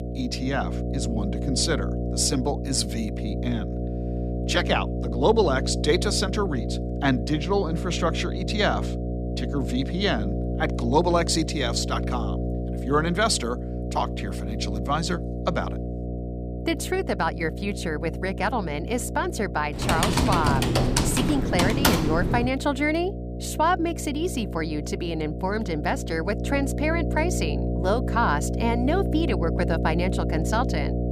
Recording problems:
electrical hum; loud; throughout; 60 Hz, 9 dB below the speech
keyboard typing; loud; from 20 to 22 s; peak 6 dB above the speech

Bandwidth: 15 kHz